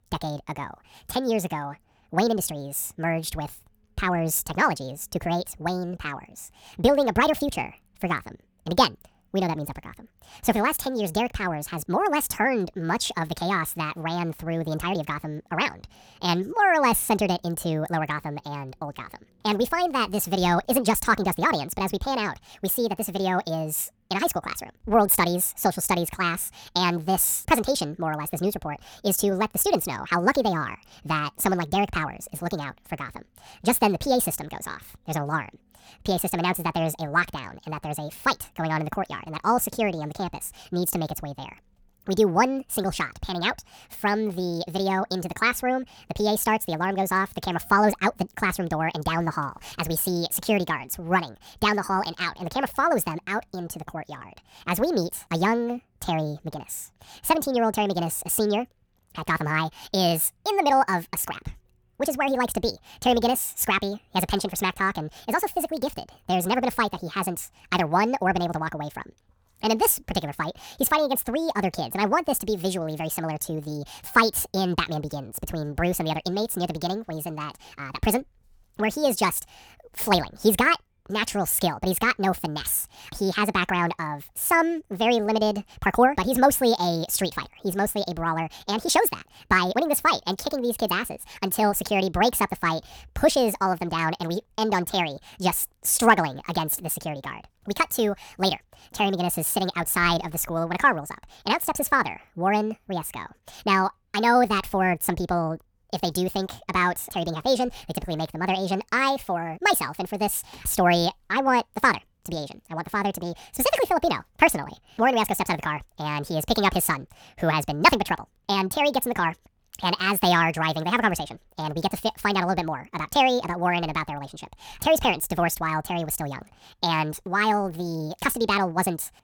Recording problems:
wrong speed and pitch; too fast and too high; 1.6 times normal speed

